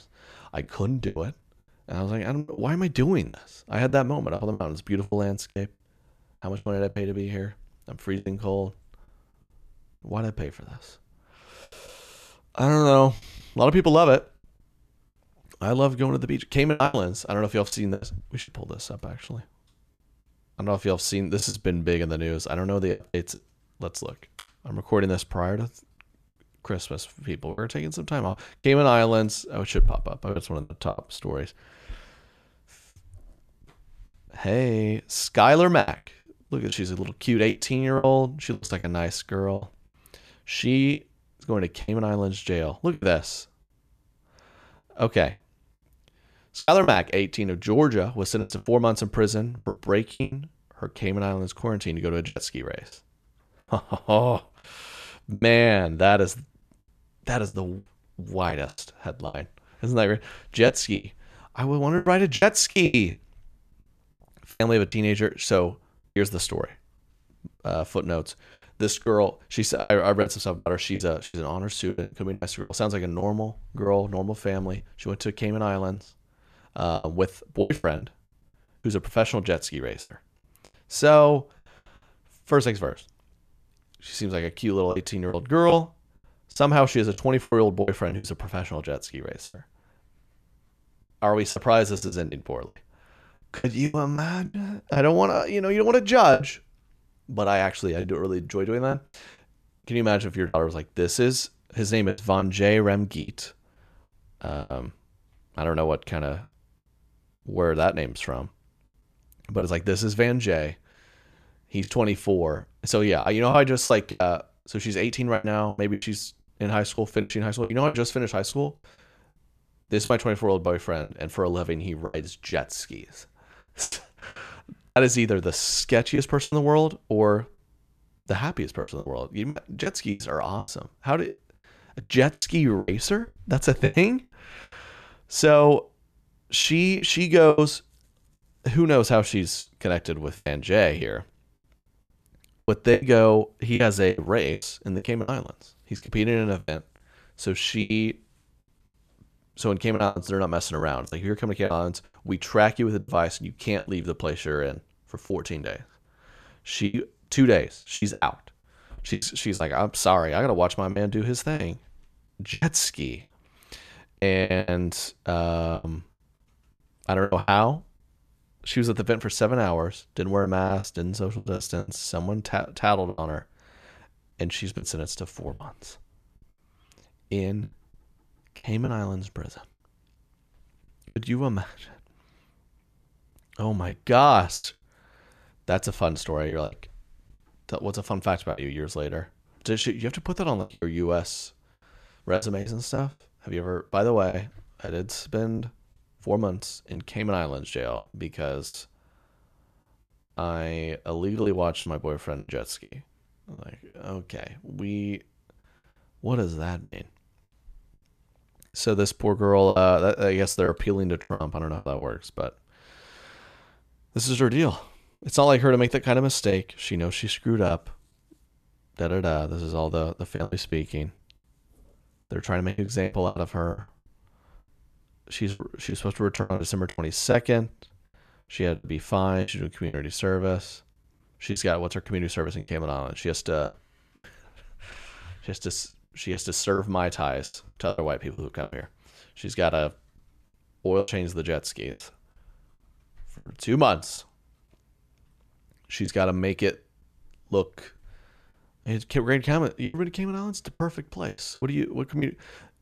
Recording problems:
choppy; very; 9% of the speech affected

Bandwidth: 14.5 kHz